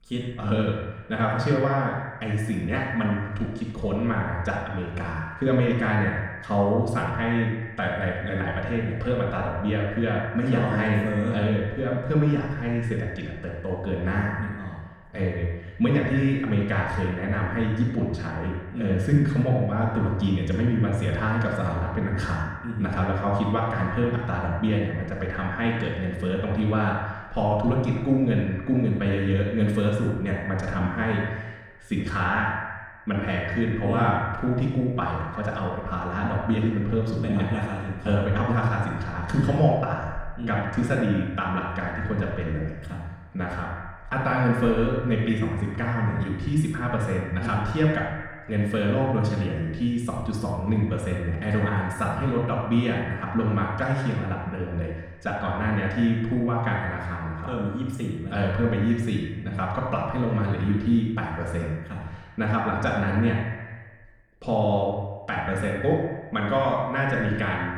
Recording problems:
echo of what is said; strong; throughout; 80 ms later, 10 dB below the speech
off-mic speech; far
room echo; noticeable; dies away in 0.7 s

